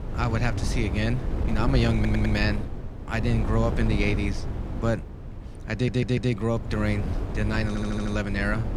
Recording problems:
wind noise on the microphone; heavy; 9 dB below the speech
audio stuttering; at 2 s, at 5.5 s and at 7.5 s

